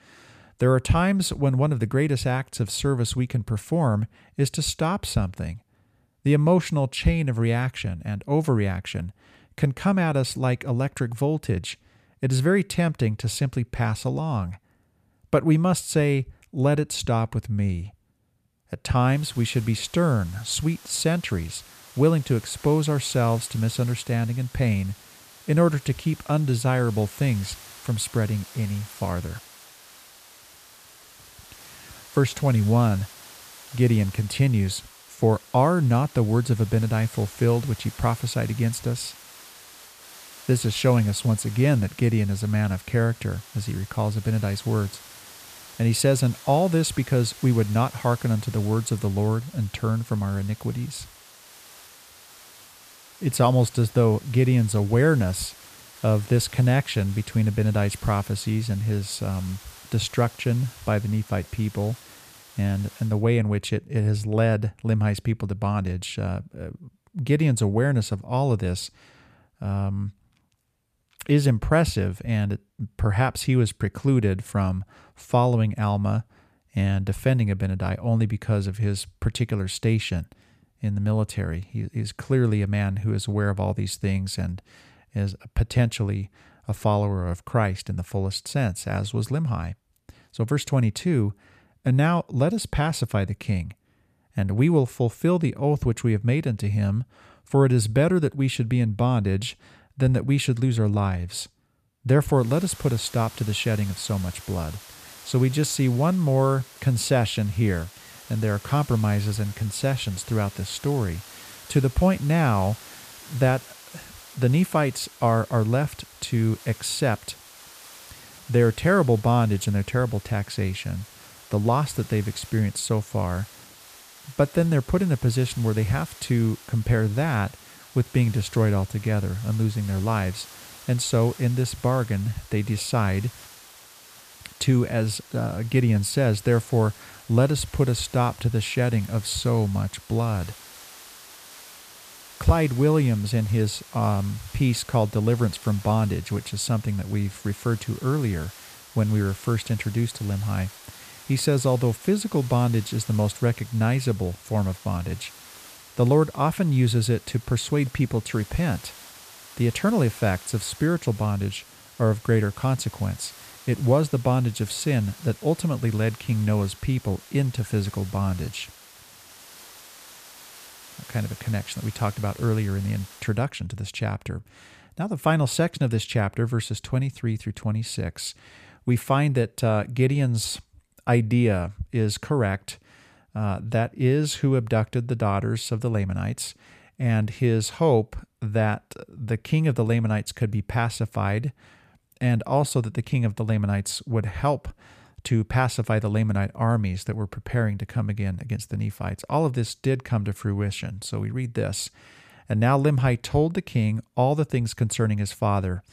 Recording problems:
hiss; noticeable; from 19 s to 1:03 and from 1:42 to 2:53; 20 dB below the speech

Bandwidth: 14.5 kHz